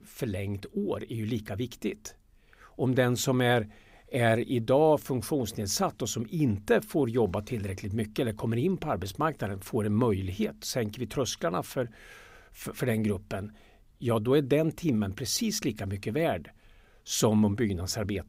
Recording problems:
none

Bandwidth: 15.5 kHz